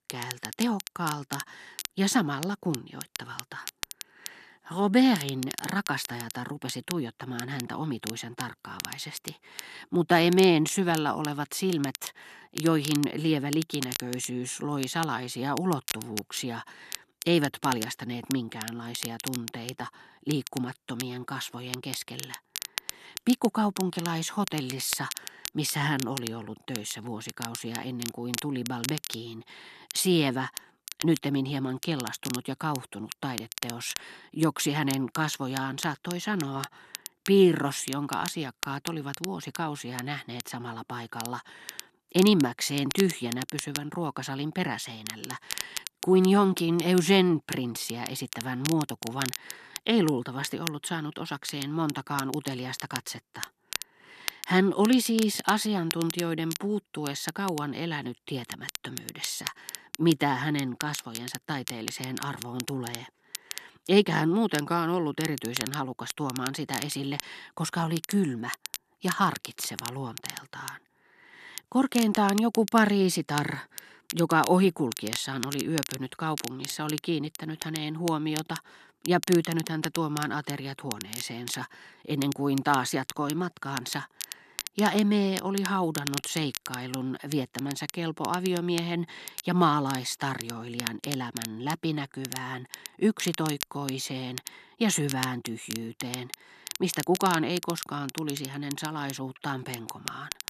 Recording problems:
crackle, like an old record; loud; 10 dB below the speech

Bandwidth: 13.5 kHz